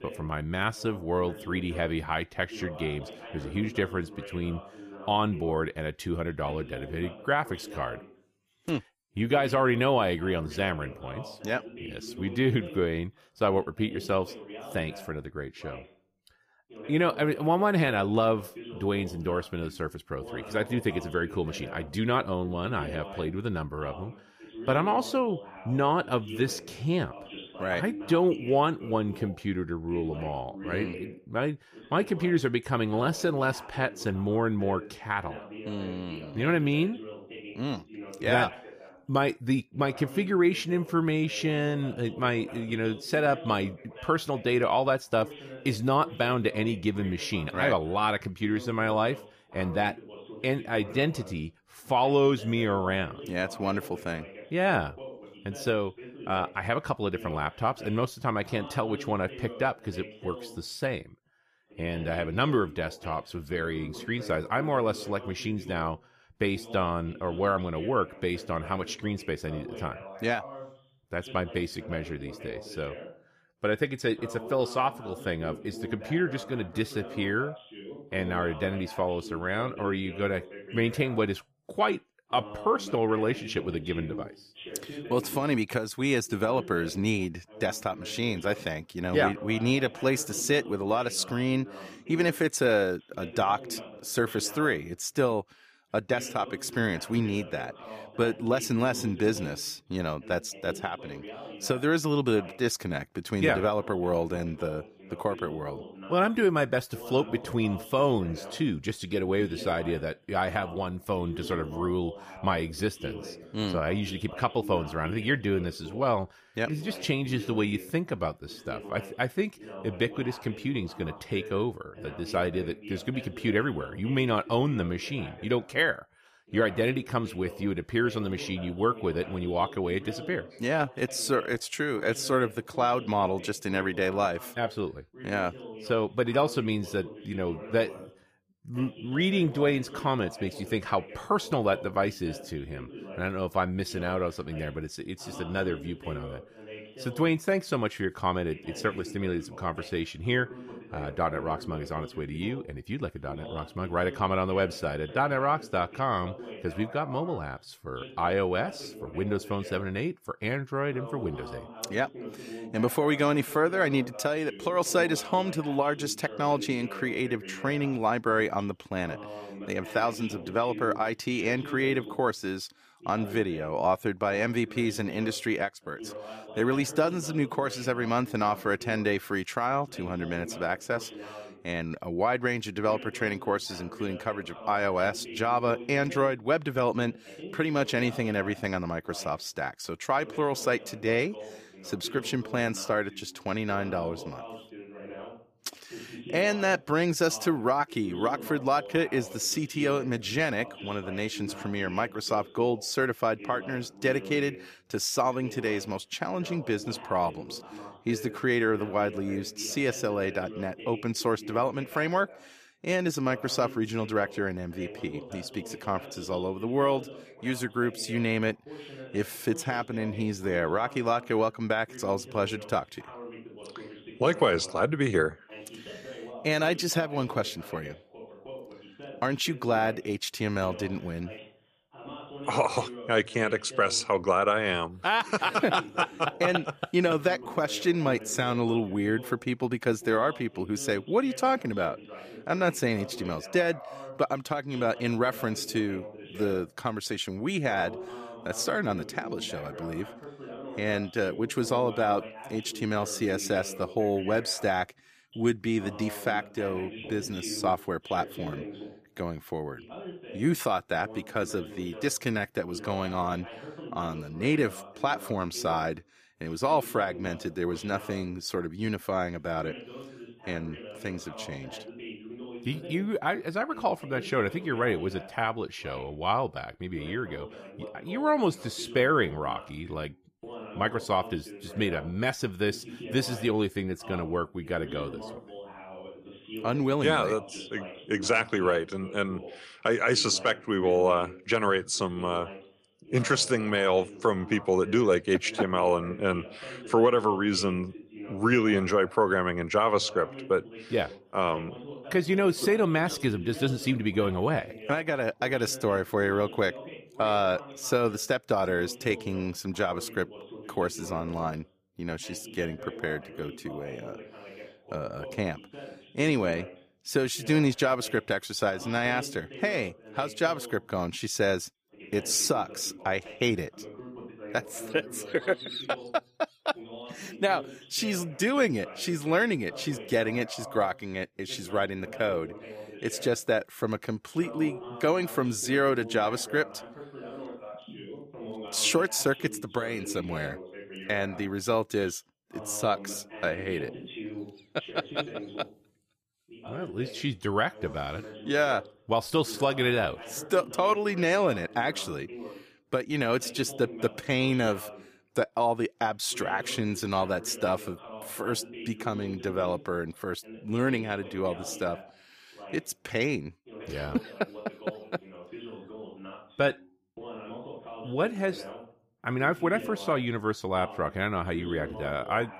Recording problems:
voice in the background; noticeable; throughout; 15 dB below the speech

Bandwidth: 15 kHz